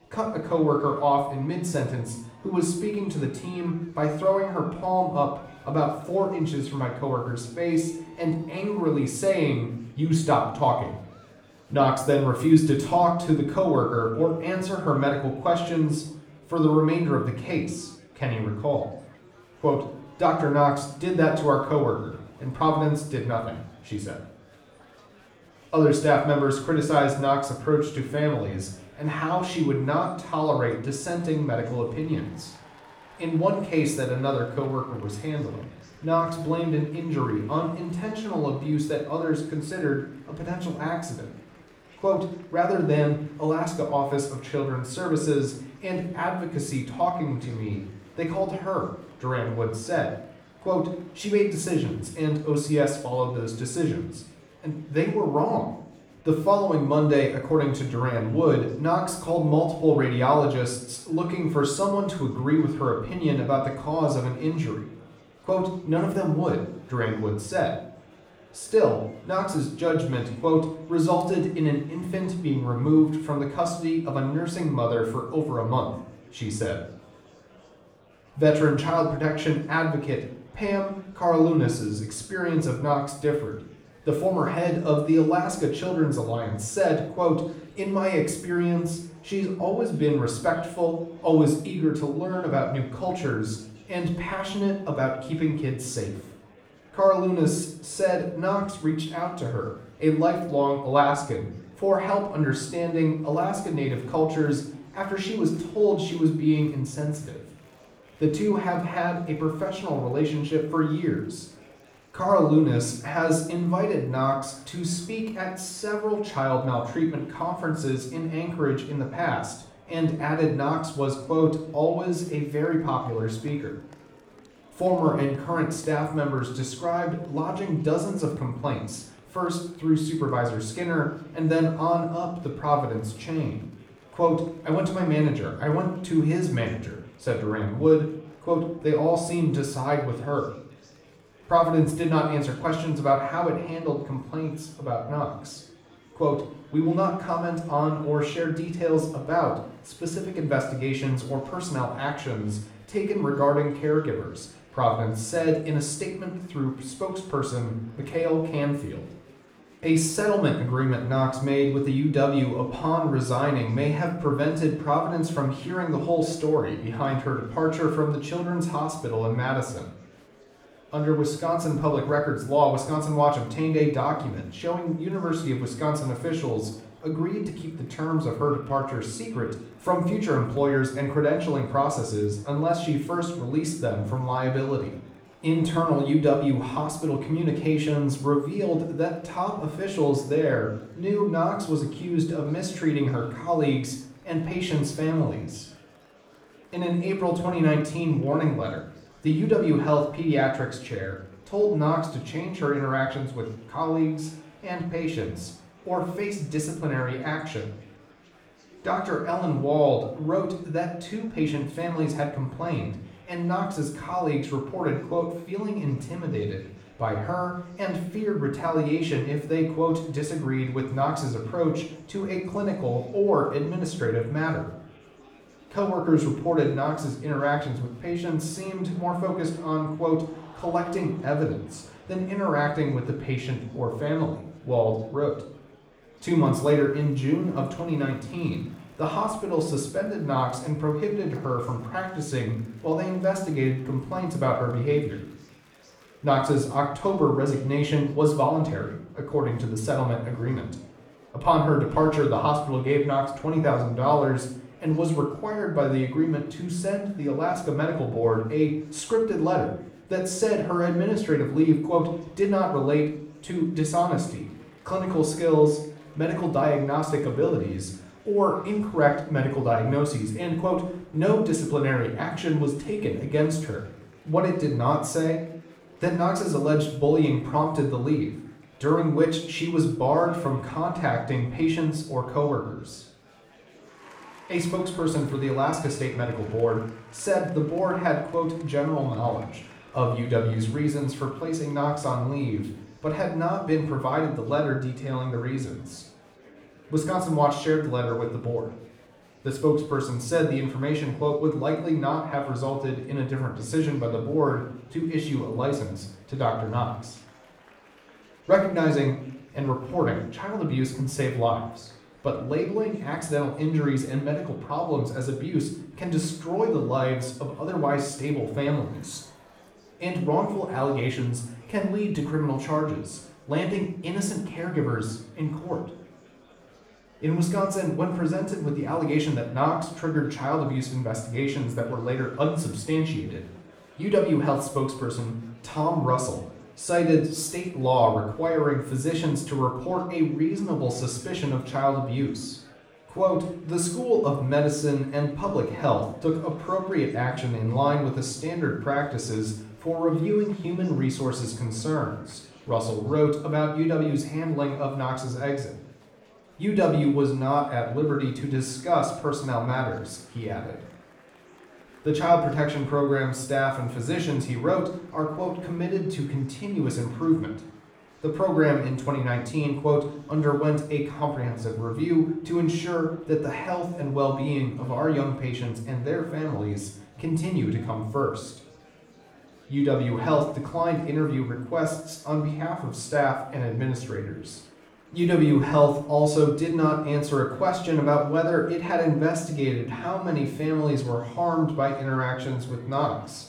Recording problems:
off-mic speech; far
room echo; noticeable; dies away in 0.5 s
murmuring crowd; faint; throughout; 25 dB below the speech

